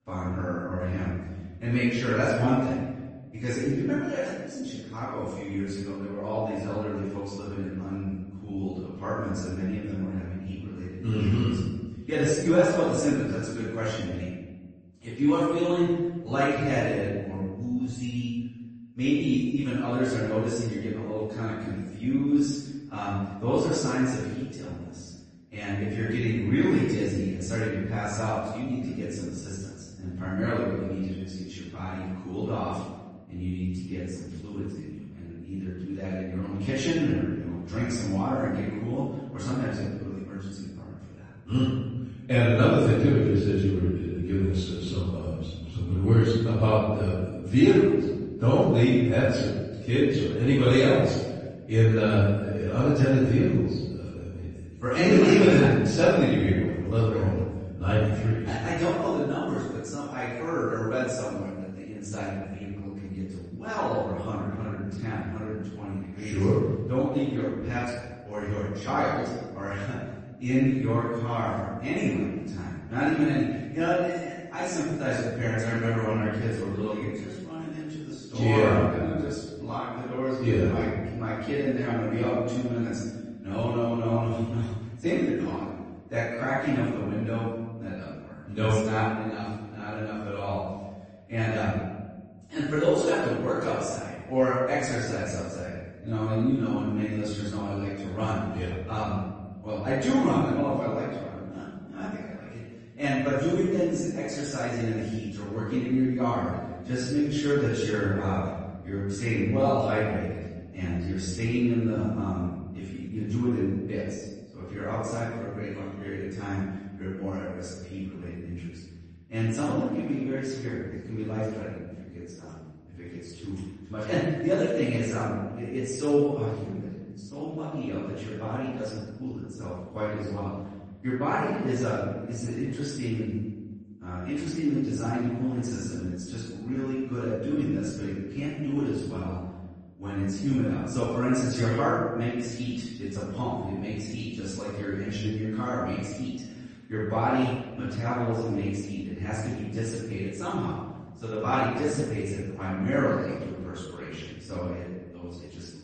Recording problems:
room echo; strong; dies away in 1.2 s
off-mic speech; far
garbled, watery; slightly; nothing above 8 kHz

